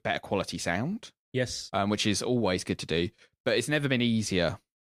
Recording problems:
none

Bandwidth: 15 kHz